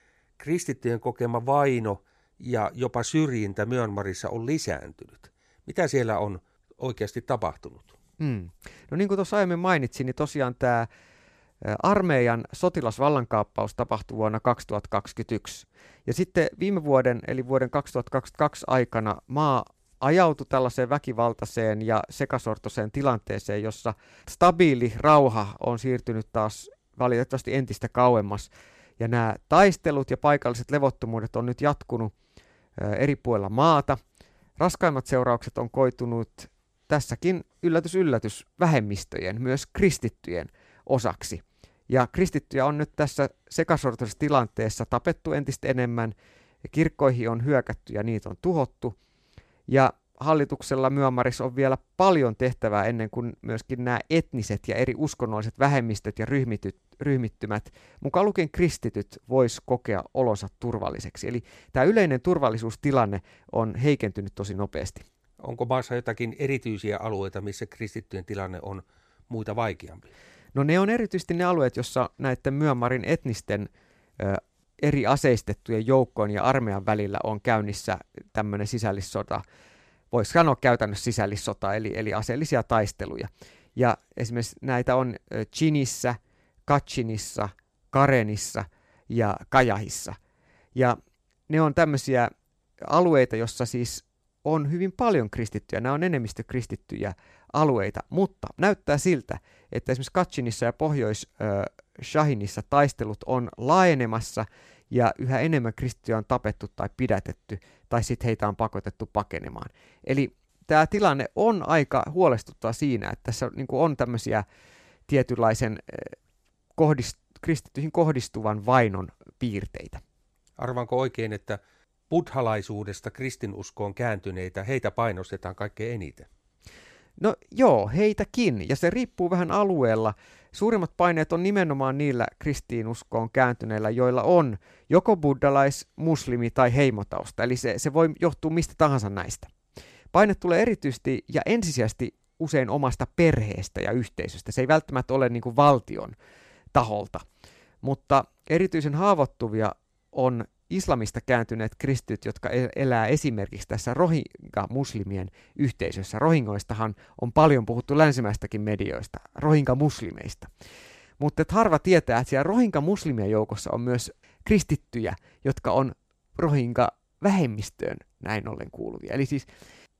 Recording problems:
none

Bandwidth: 14.5 kHz